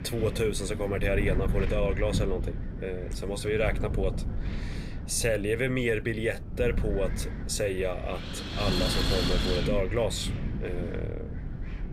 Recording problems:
wind noise on the microphone; heavy; 6 dB below the speech

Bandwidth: 15.5 kHz